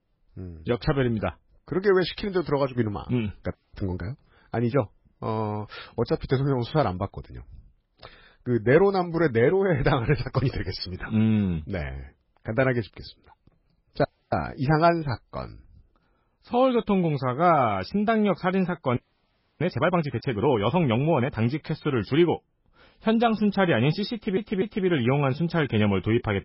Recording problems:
garbled, watery; badly; nothing above 5.5 kHz
audio freezing; at 3.5 s, at 14 s and at 19 s for 0.5 s
audio stuttering; at 24 s

